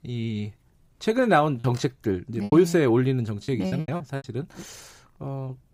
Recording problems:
choppy; very; from 1.5 to 4 s; 12% of the speech affected

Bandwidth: 15.5 kHz